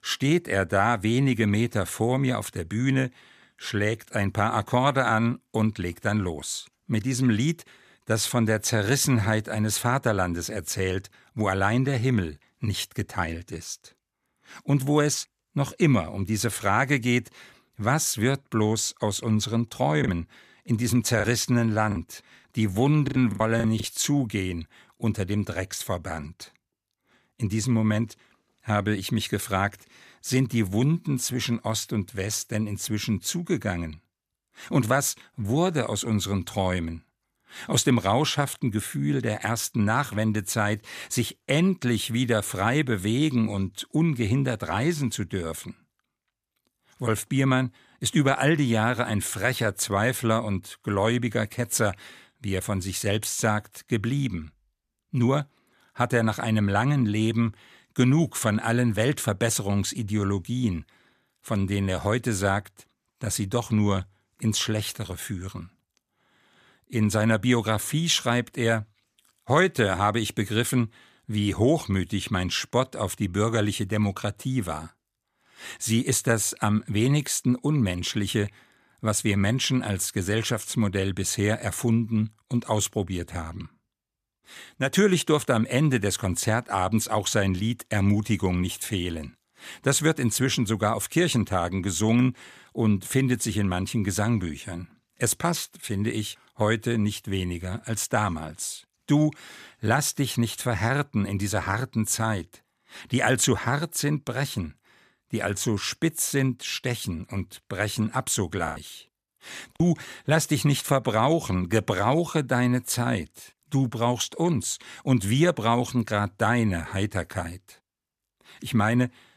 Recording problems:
choppy; very; from 20 to 24 s and from 1:49 to 1:50; 8% of the speech affected

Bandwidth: 14.5 kHz